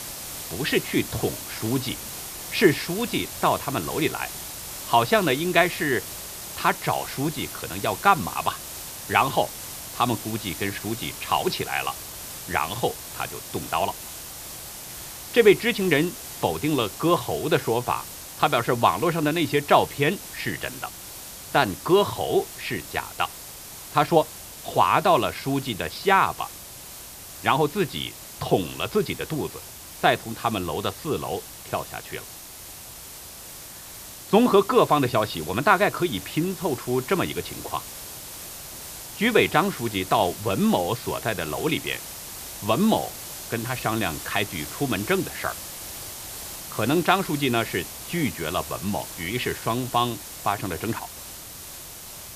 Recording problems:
high frequencies cut off; noticeable; nothing above 5.5 kHz
hiss; noticeable; throughout; 10 dB below the speech

